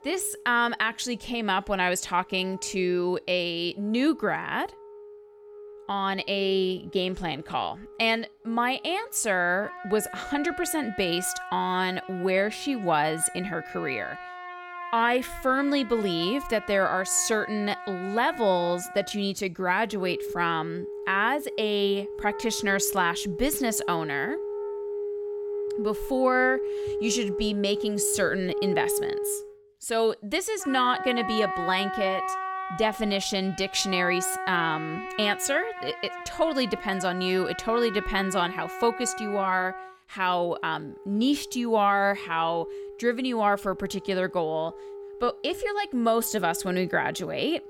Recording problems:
background music; loud; throughout; 9 dB below the speech

